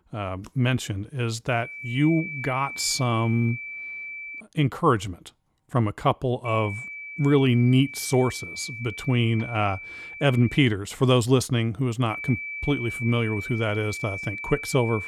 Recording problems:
high-pitched whine; loud; from 1.5 to 4.5 s, from 6.5 to 11 s and from 12 s on; 2.5 kHz, 9 dB below the speech

